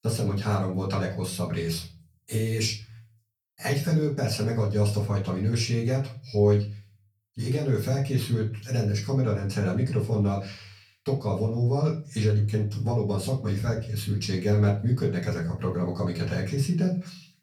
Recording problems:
off-mic speech; far
room echo; slight; dies away in 0.3 s

